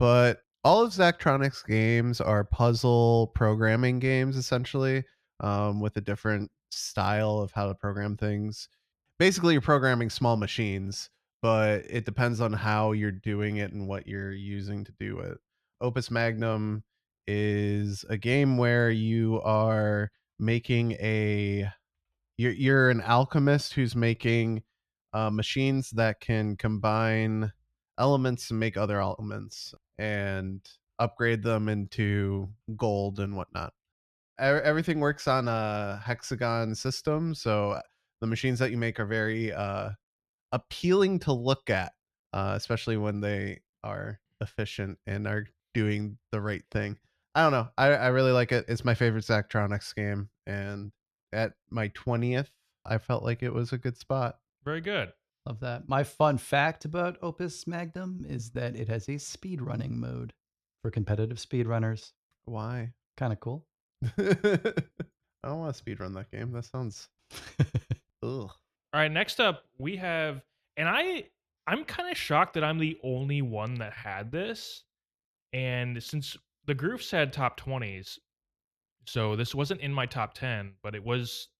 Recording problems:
abrupt cut into speech; at the start

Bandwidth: 14.5 kHz